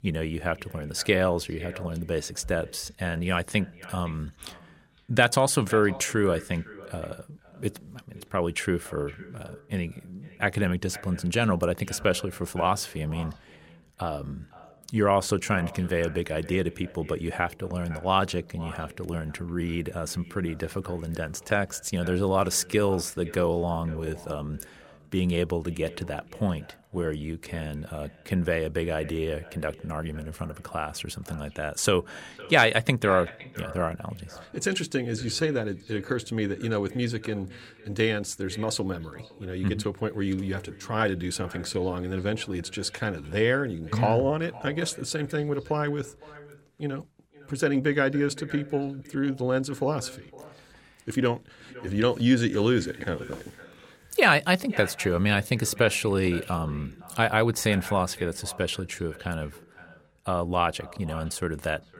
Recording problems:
echo of what is said; faint; throughout; 510 ms later, 20 dB below the speech

